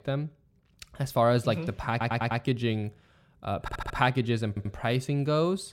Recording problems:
audio stuttering; at 2 s, at 3.5 s and at 4.5 s

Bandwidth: 16 kHz